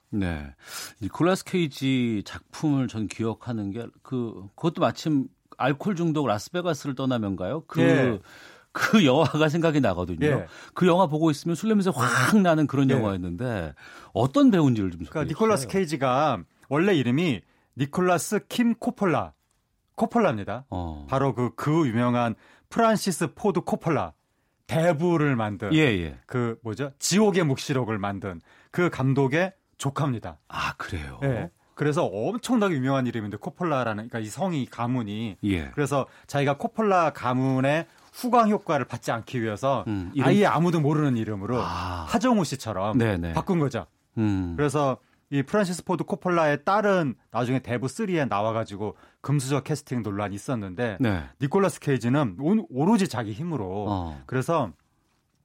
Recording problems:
none

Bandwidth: 16 kHz